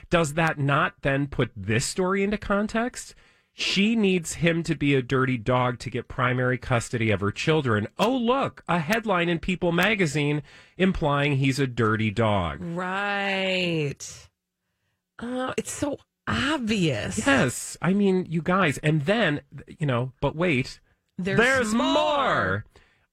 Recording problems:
garbled, watery; slightly; nothing above 17 kHz

